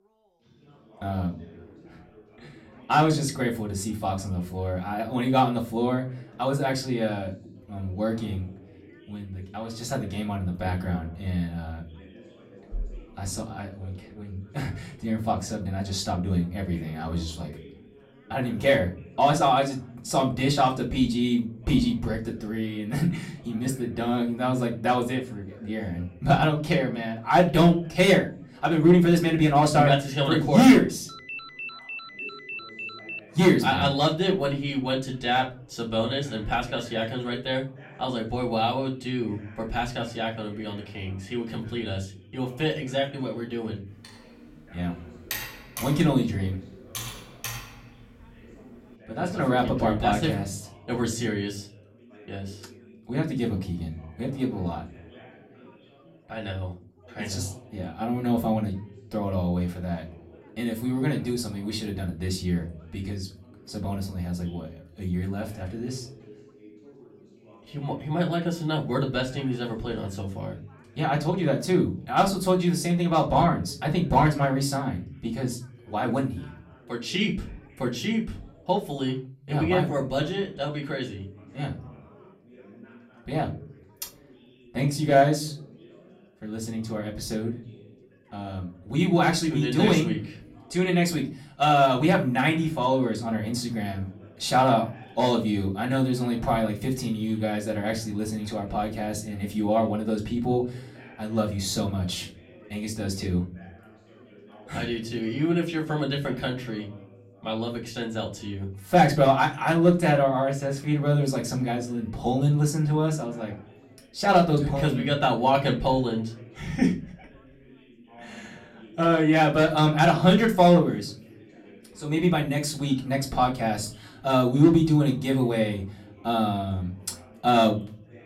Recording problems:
off-mic speech; far
room echo; very slight; dies away in 0.3 s
background chatter; faint; throughout; 3 voices, 25 dB below the speech
phone ringing; noticeable; from 31 to 33 s; peak 9 dB below the speech
keyboard typing; noticeable; from 44 to 48 s; peak 7 dB below the speech

